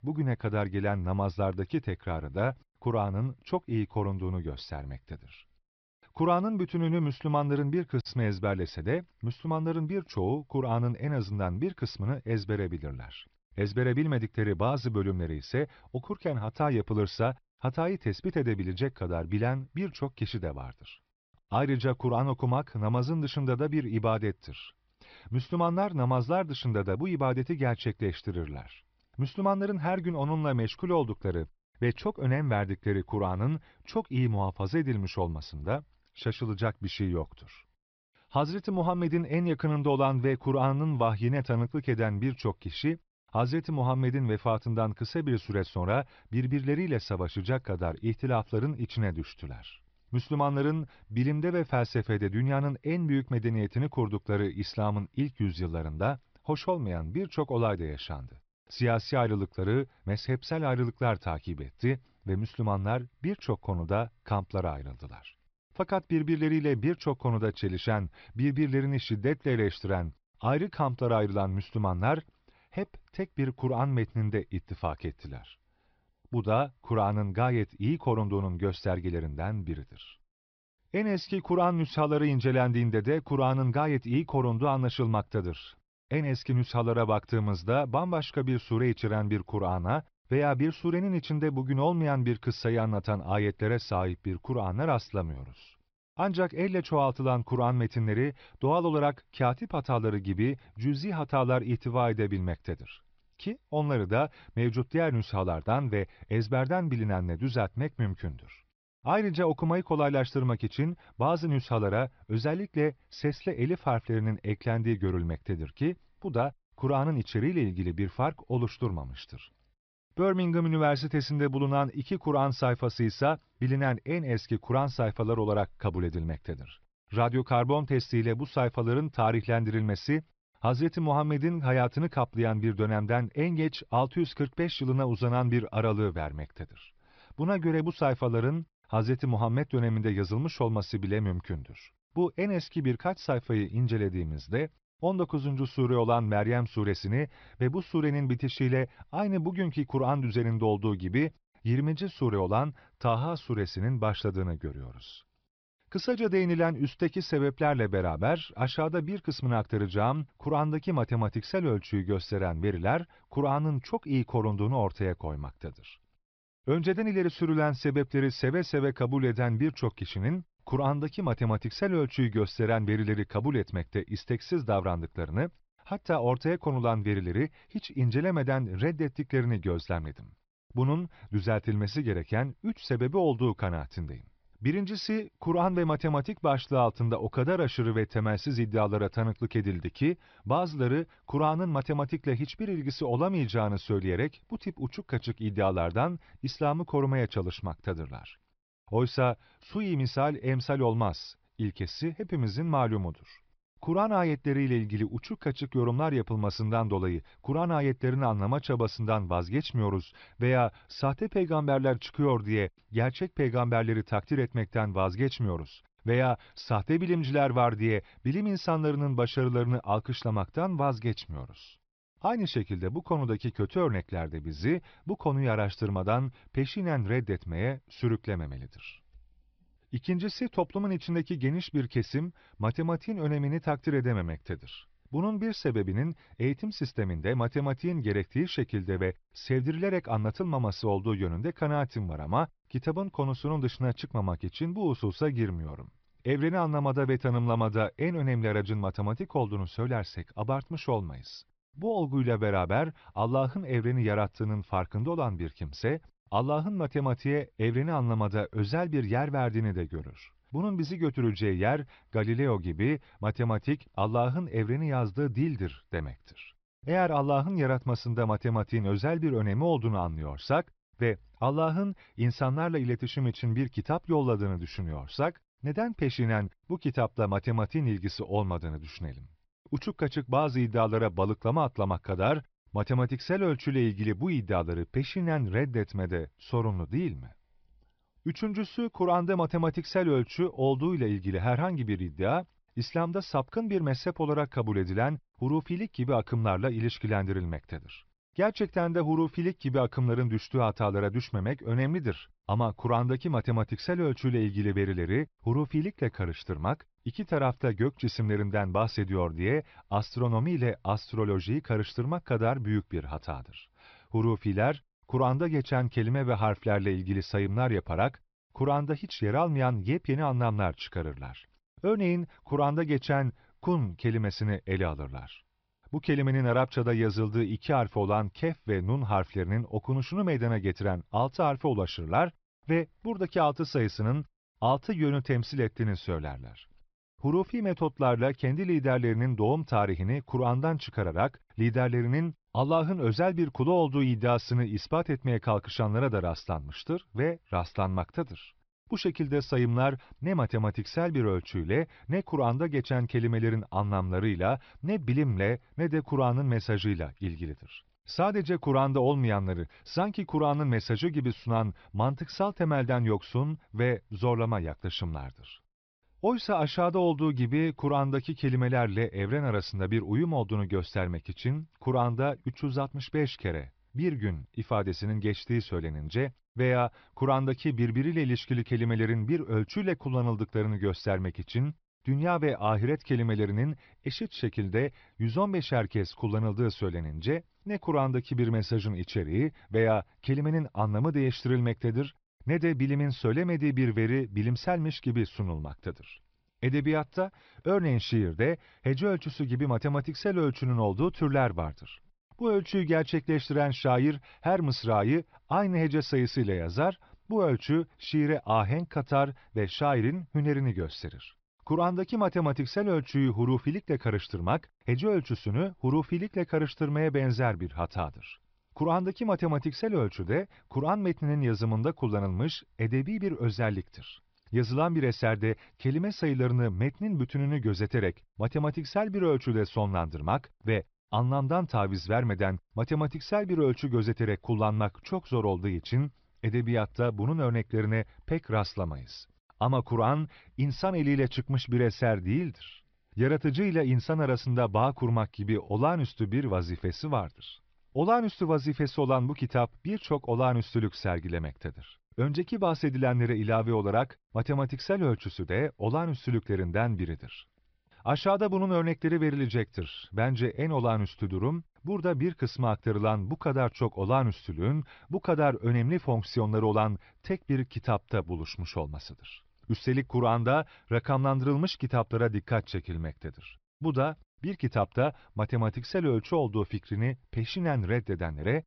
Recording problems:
high frequencies cut off; noticeable; nothing above 5.5 kHz

